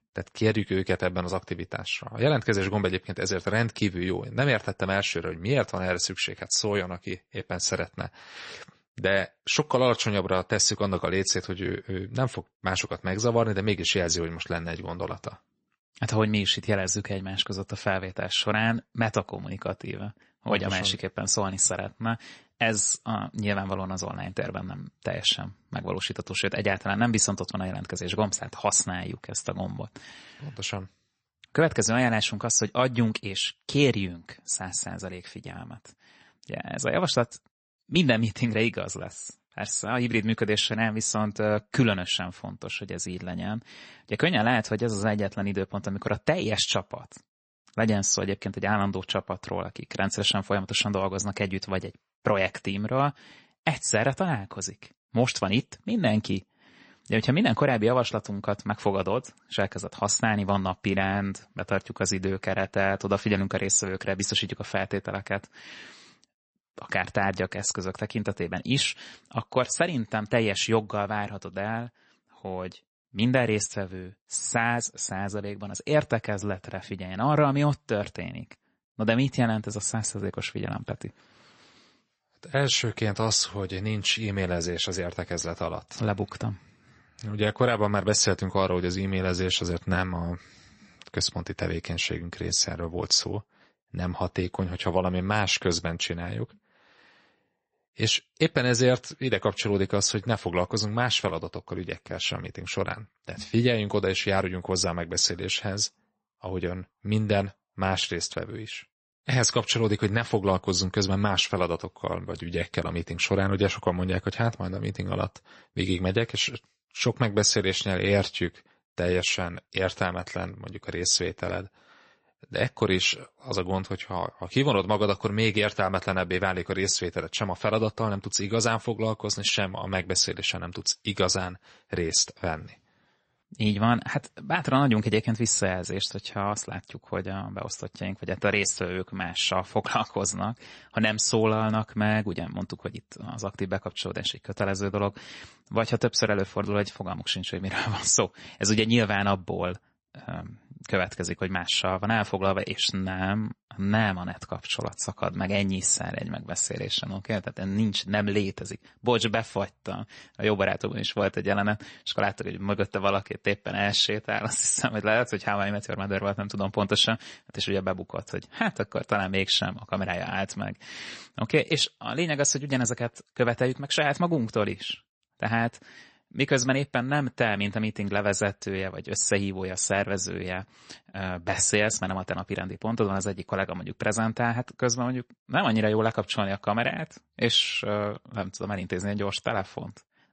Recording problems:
garbled, watery; slightly; nothing above 8 kHz

